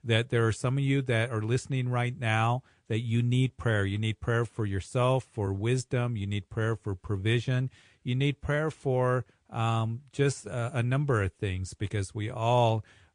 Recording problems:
garbled, watery; slightly; nothing above 9 kHz

